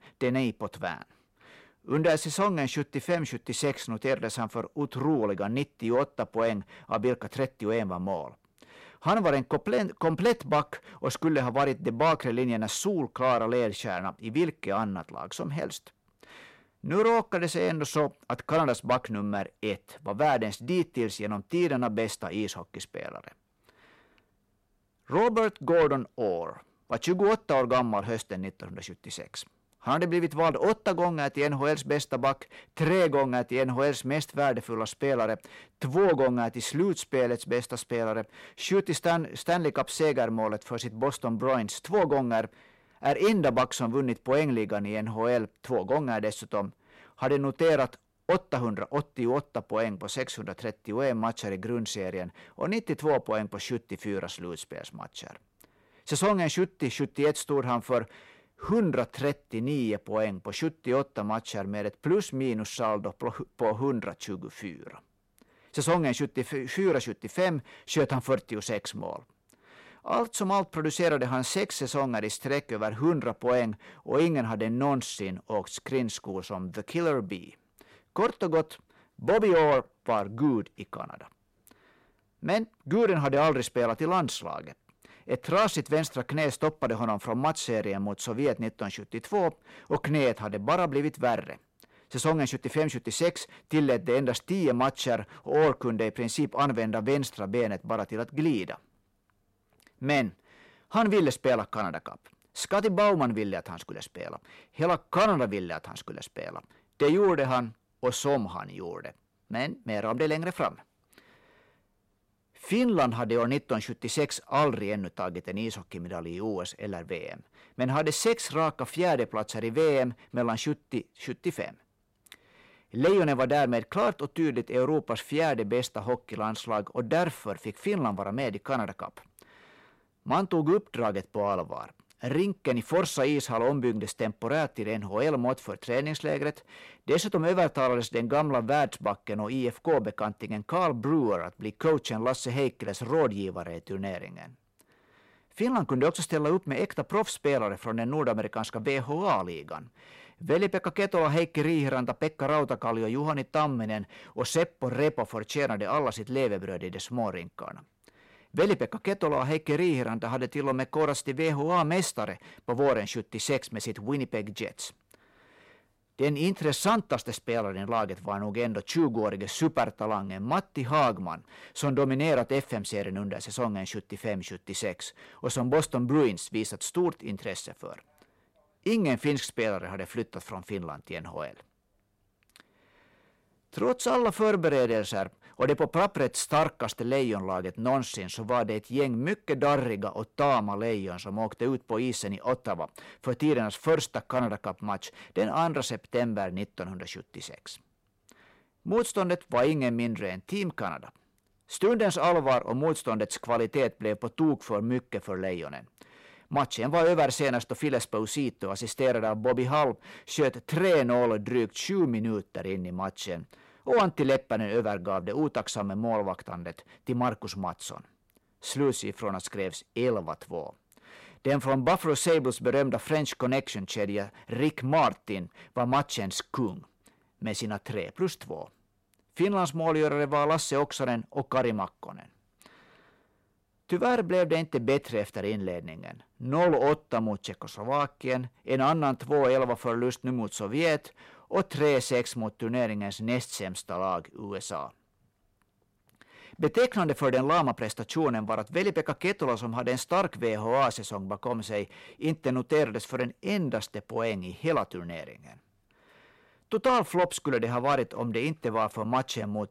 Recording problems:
distortion; slight; 10 dB below the speech

